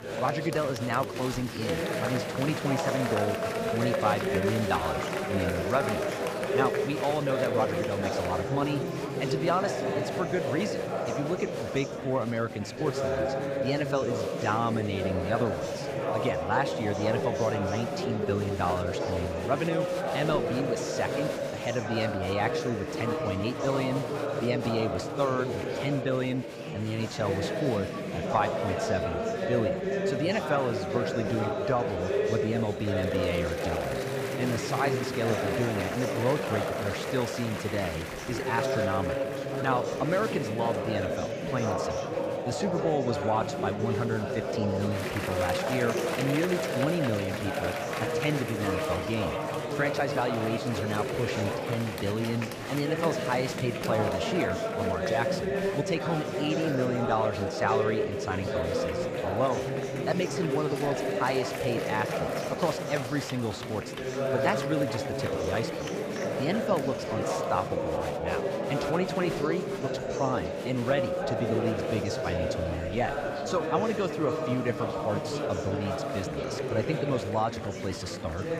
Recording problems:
murmuring crowd; very loud; throughout; as loud as the speech

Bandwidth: 15.5 kHz